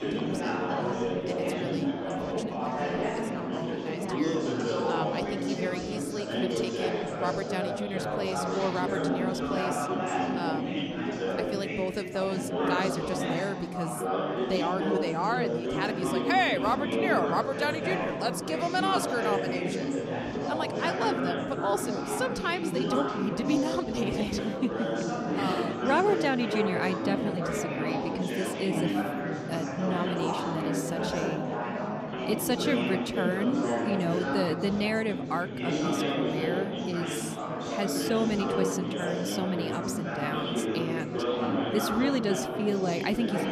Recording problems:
chatter from many people; very loud; throughout; 1 dB above the speech

